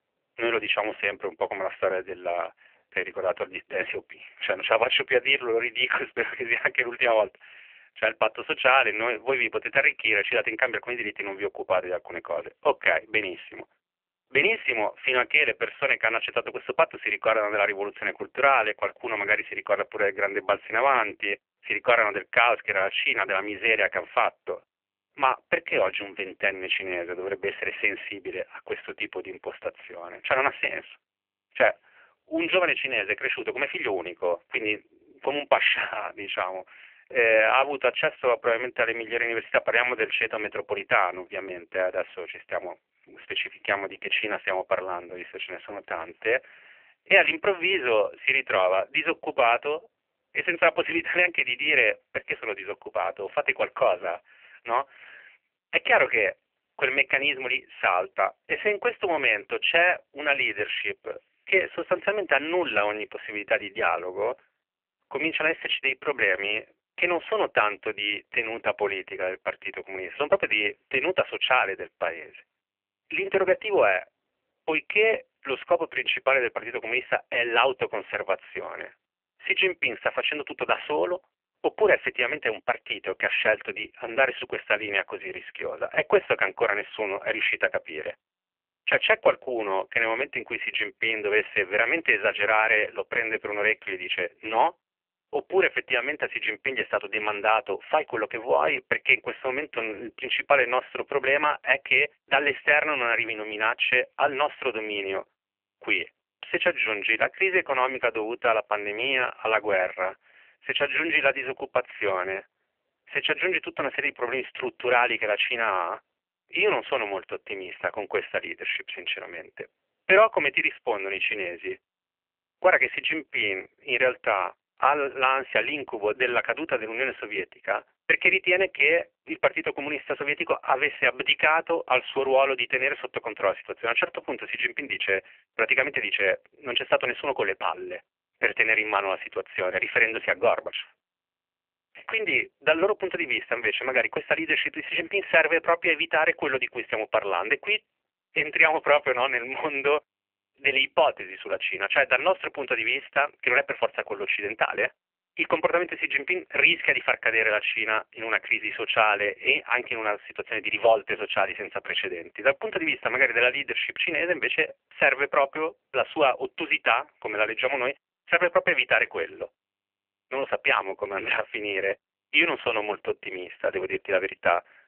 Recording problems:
phone-call audio; poor line; nothing above 3 kHz

